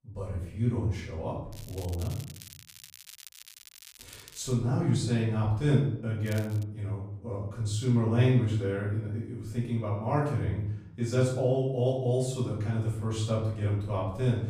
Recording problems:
off-mic speech; far
room echo; noticeable; dies away in 0.6 s
crackling; noticeable; from 1.5 to 4.5 s and at 6.5 s; 20 dB below the speech

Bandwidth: 15 kHz